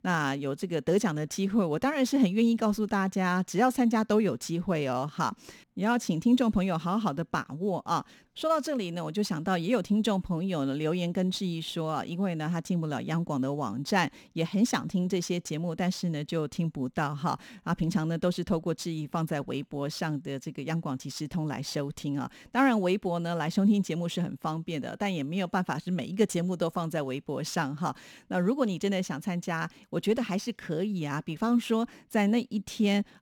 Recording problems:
none

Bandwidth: 18.5 kHz